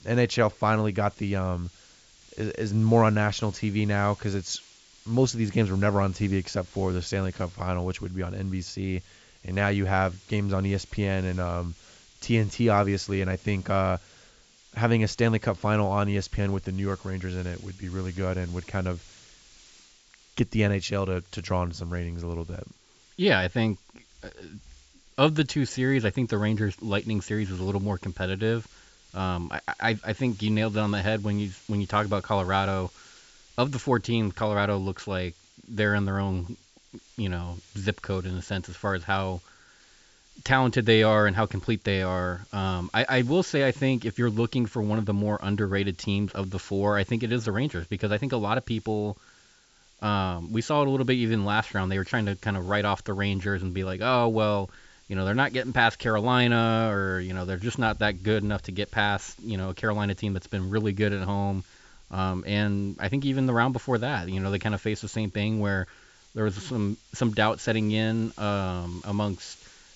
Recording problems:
high frequencies cut off; noticeable; nothing above 8 kHz
hiss; faint; throughout; 25 dB below the speech

